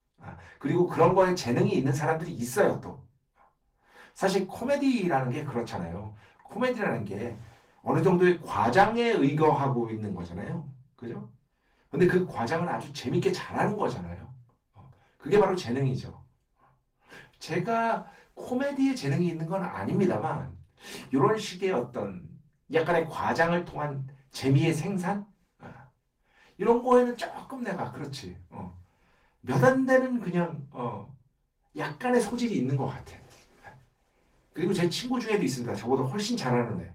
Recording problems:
off-mic speech; far
room echo; very slight; dies away in 0.3 s
garbled, watery; slightly; nothing above 16 kHz

